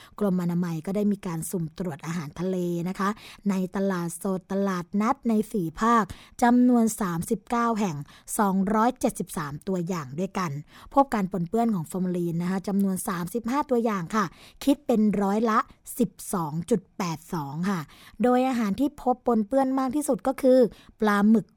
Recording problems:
none

